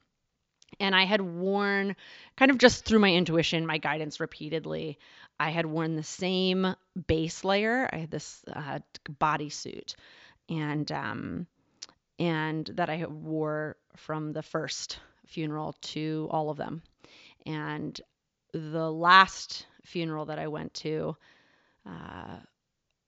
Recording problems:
high frequencies cut off; noticeable; nothing above 7.5 kHz

